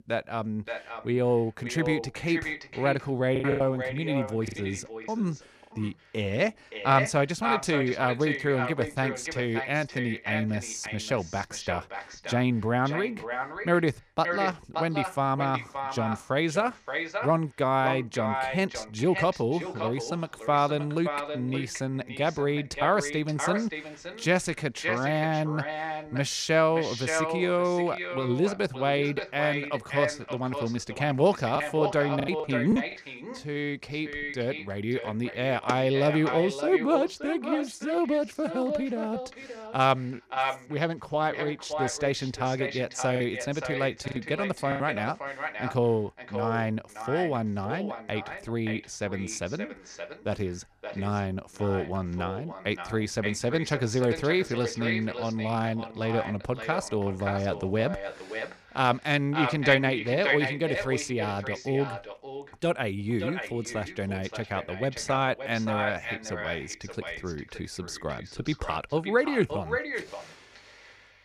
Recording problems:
echo of what is said; strong; throughout; 570 ms later, 7 dB below the speech
choppy; very; from 3.5 to 5 s, from 32 to 33 s and from 43 to 45 s; 8% of the speech affected

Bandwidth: 14.5 kHz